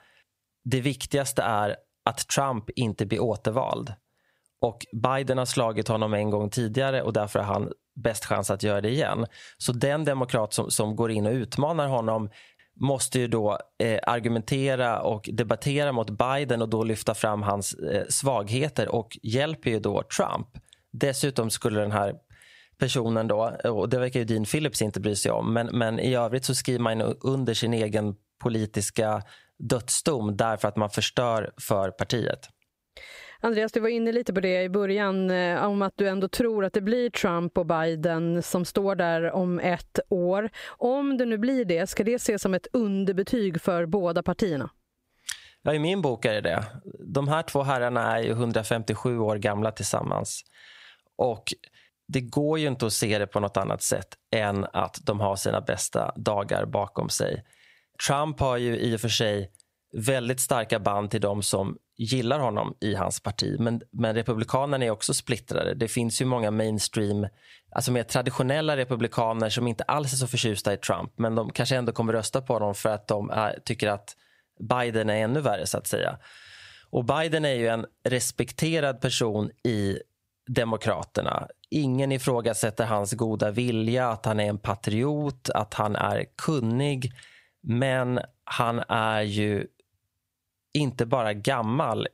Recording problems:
squashed, flat; somewhat

